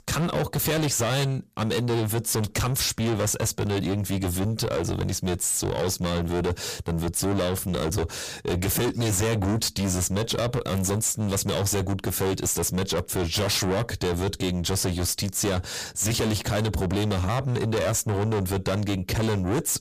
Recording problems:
distortion; heavy; 5 dB below the speech

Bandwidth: 15 kHz